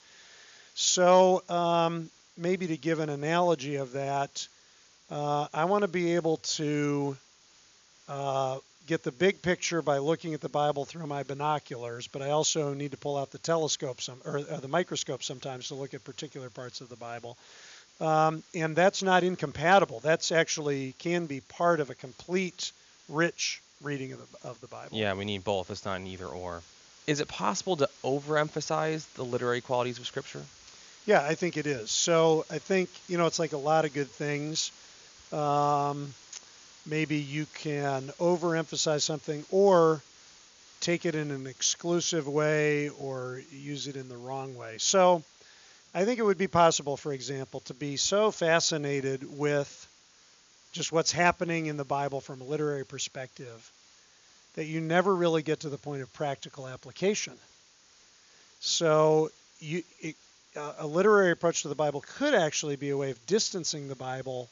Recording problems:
high frequencies cut off; noticeable; nothing above 7 kHz
hiss; faint; throughout; 25 dB below the speech

